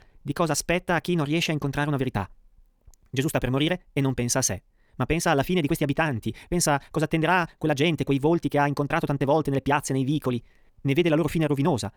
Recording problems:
wrong speed, natural pitch; too fast; 1.7 times normal speed

